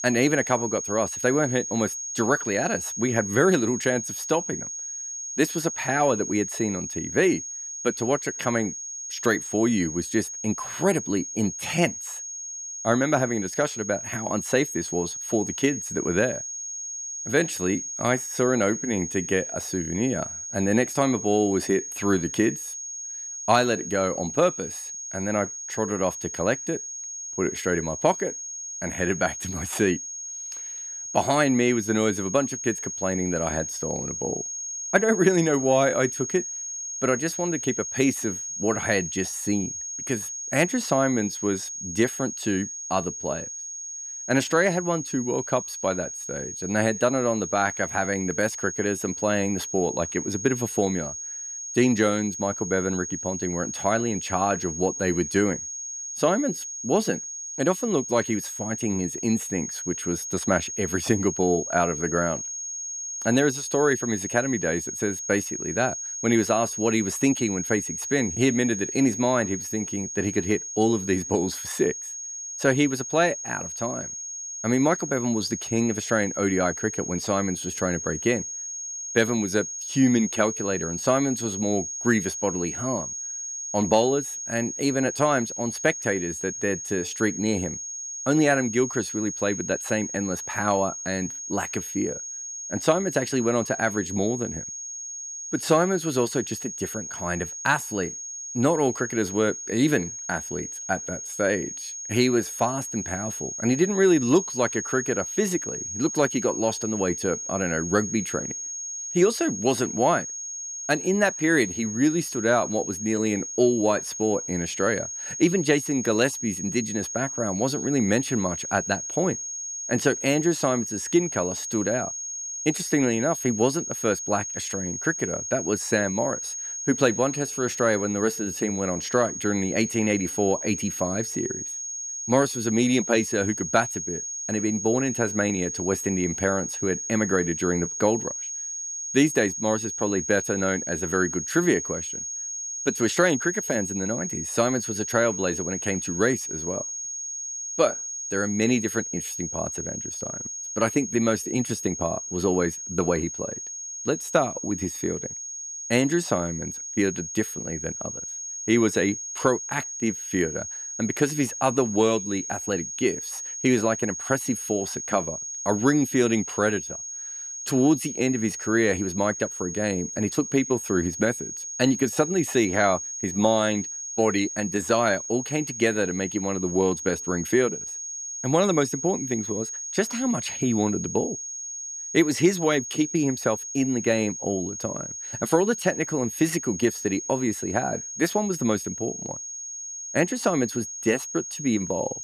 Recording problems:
high-pitched whine; loud; throughout; 6.5 kHz, 6 dB below the speech

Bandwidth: 14.5 kHz